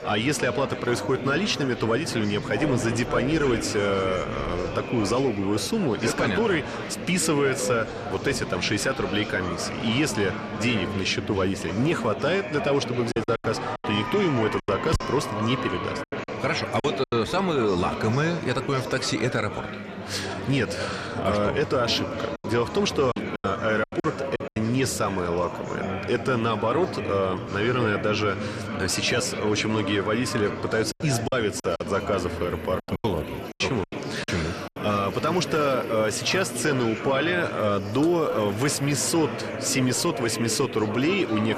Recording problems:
echo of what is said; faint; throughout; 290 ms later, 20 dB below the speech
murmuring crowd; loud; throughout; 6 dB below the speech
animal sounds; faint; throughout; 20 dB below the speech
choppy; very; from 13 to 17 s, from 23 to 25 s and from 31 to 34 s; 13% of the speech affected

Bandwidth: 13.5 kHz